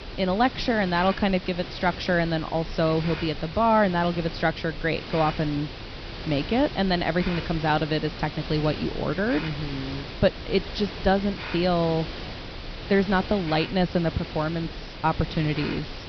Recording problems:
high frequencies cut off; noticeable; nothing above 5.5 kHz
hiss; noticeable; throughout; 10 dB below the speech

